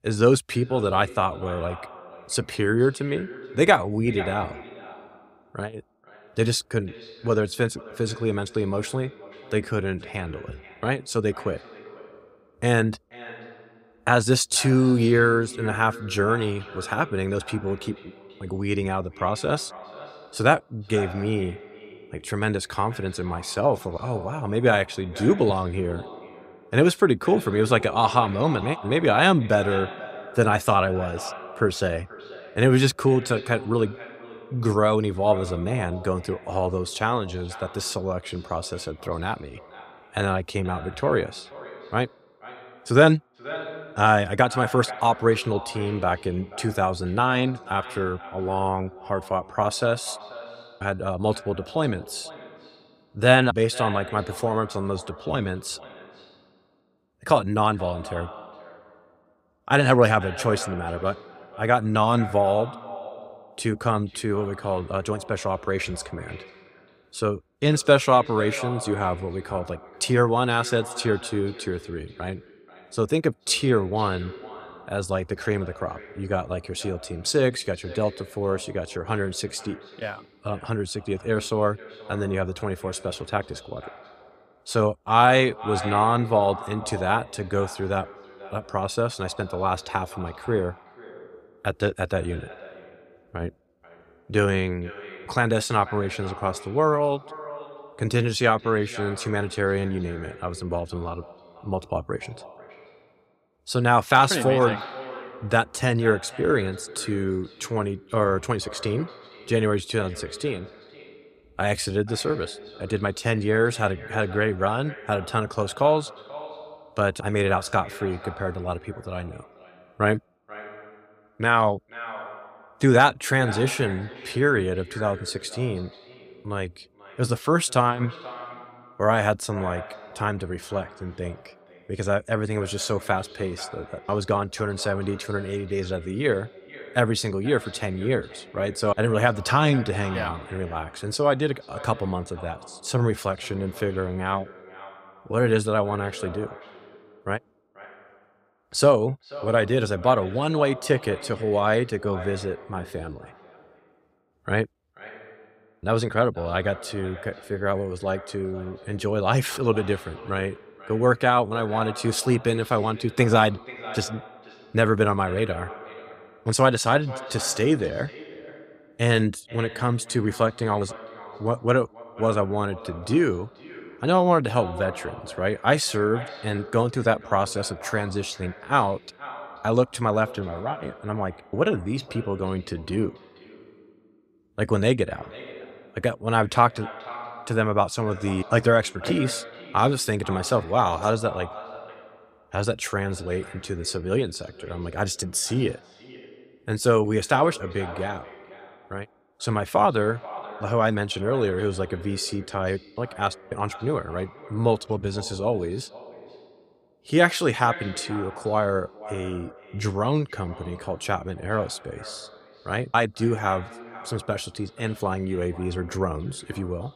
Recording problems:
echo of what is said; noticeable; throughout; 480 ms later, 15 dB below the speech

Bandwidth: 15.5 kHz